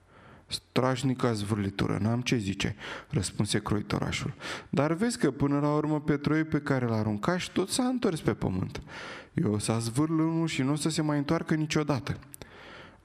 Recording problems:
squashed, flat; somewhat

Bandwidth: 14.5 kHz